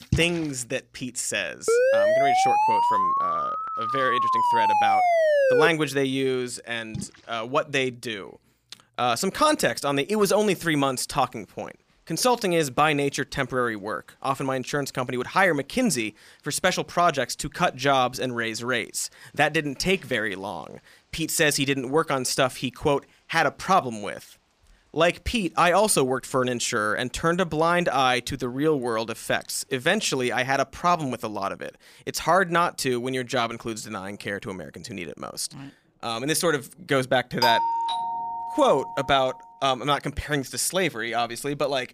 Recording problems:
rain or running water; noticeable; throughout; 15 dB below the speech
siren; loud; from 1.5 to 5.5 s; peak 5 dB above the speech
doorbell; loud; from 37 to 39 s; peak 2 dB above the speech

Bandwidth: 15 kHz